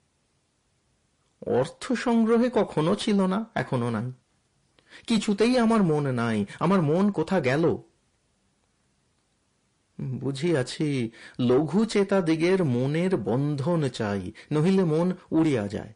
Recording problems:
distortion; slight; 10 dB below the speech
garbled, watery; slightly; nothing above 10.5 kHz

